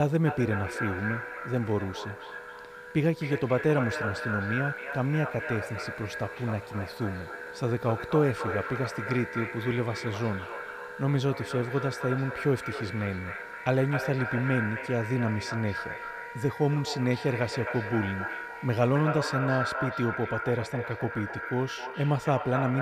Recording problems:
echo of what is said; strong; throughout; 260 ms later, 6 dB below the speech
background music; noticeable; throughout; 15 dB below the speech
hiss; faint; until 19 s; 25 dB below the speech
abrupt cut into speech; at the start and the end

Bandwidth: 15.5 kHz